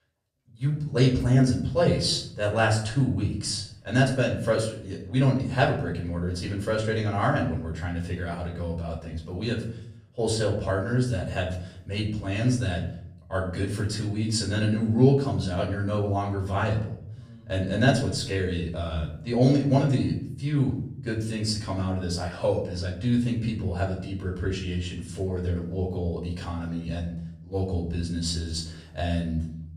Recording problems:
off-mic speech; far
room echo; slight; dies away in 0.6 s

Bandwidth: 14.5 kHz